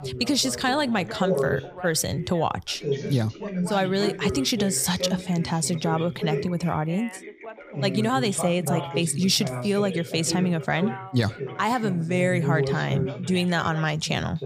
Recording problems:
background chatter; loud; throughout; 3 voices, 7 dB below the speech

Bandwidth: 15.5 kHz